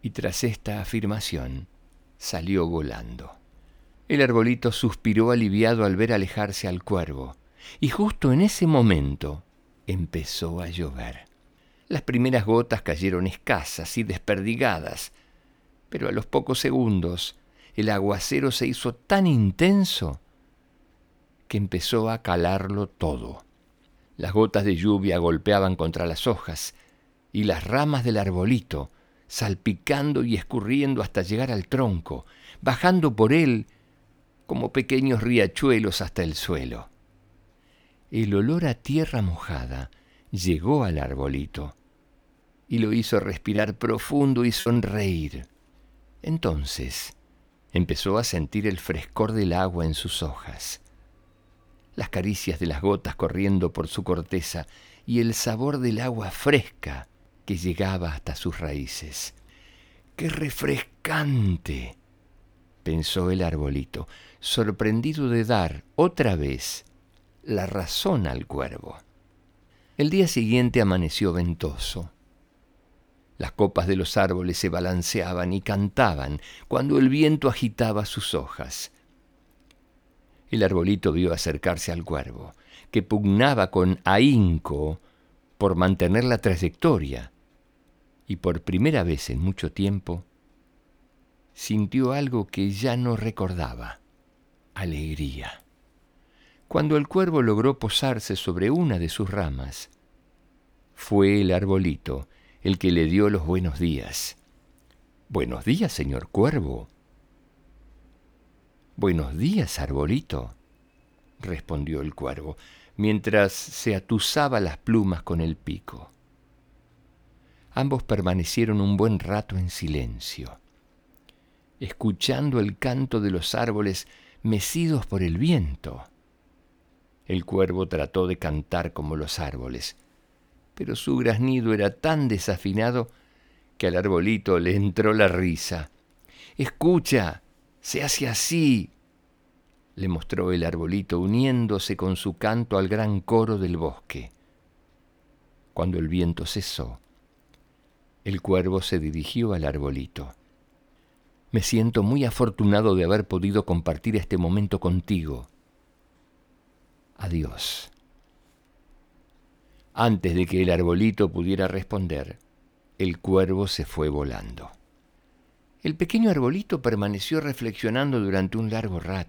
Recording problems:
choppy; very; from 44 to 45 s; 12% of the speech affected

